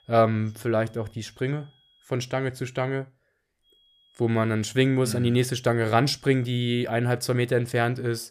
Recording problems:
high-pitched whine; faint; until 2 s and from 3.5 to 7 s; 3.5 kHz, 35 dB below the speech

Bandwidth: 14.5 kHz